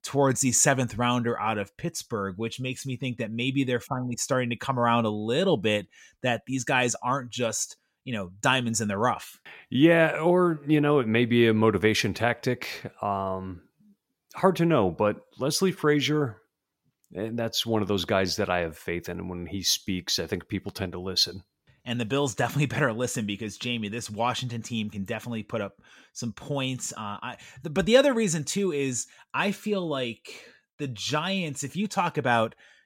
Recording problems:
none

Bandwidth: 16.5 kHz